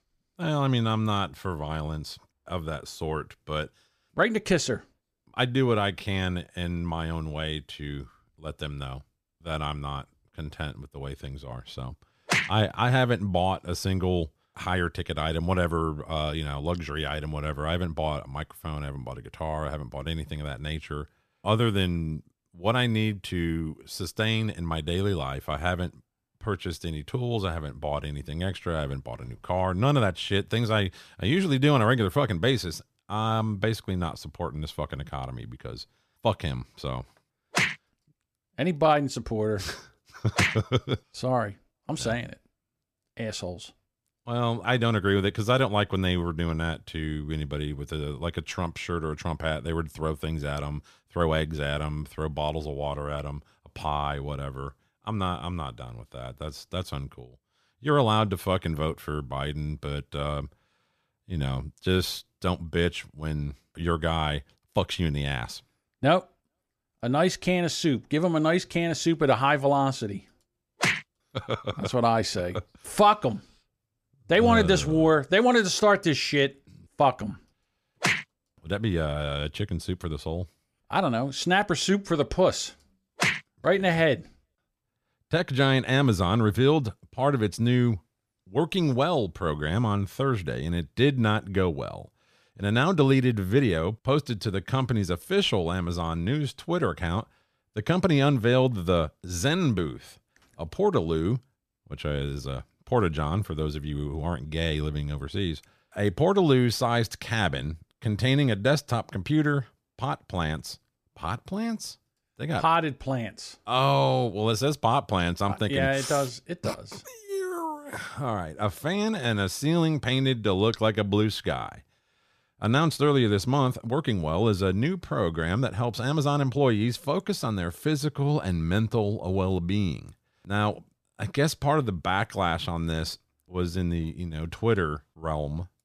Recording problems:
none

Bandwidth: 14.5 kHz